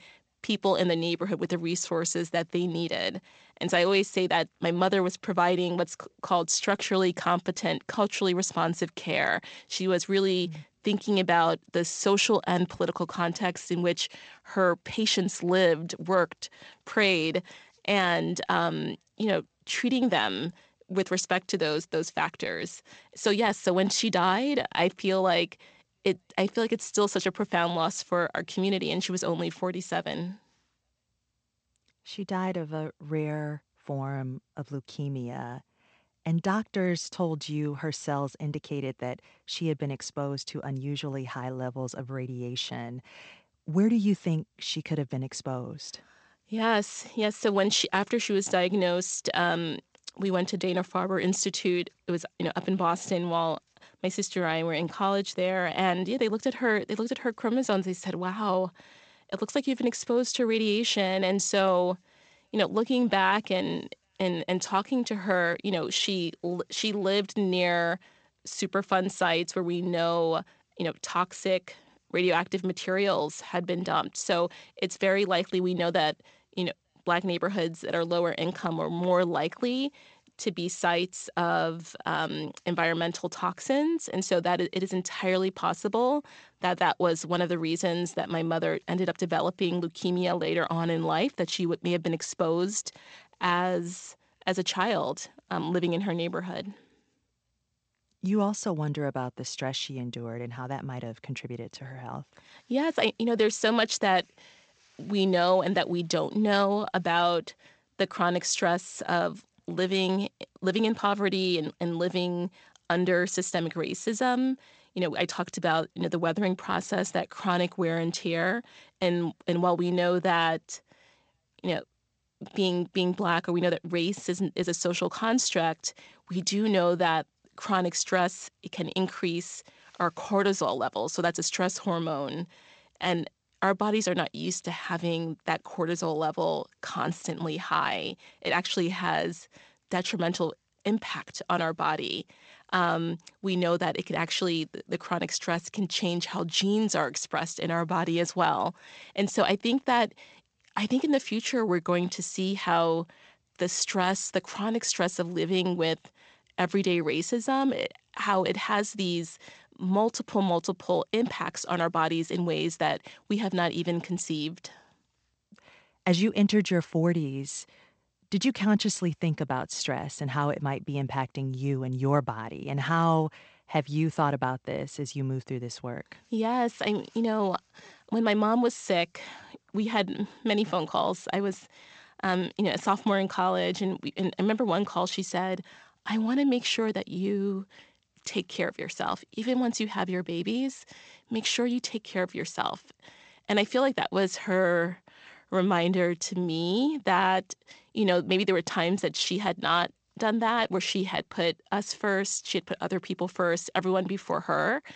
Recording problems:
garbled, watery; slightly; nothing above 8 kHz

